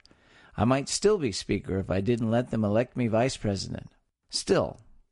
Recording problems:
garbled, watery; slightly; nothing above 10.5 kHz

